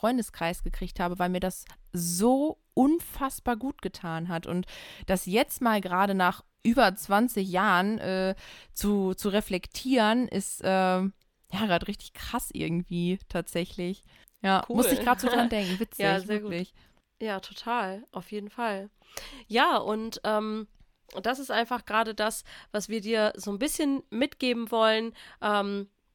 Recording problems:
none

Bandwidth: 17.5 kHz